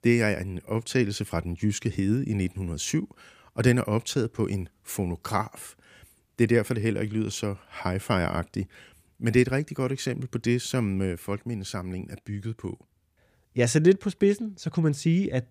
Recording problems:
none

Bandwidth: 15 kHz